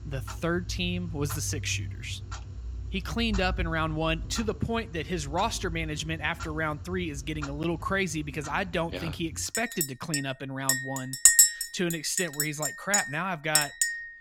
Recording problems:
household noises; very loud; throughout; 4 dB above the speech

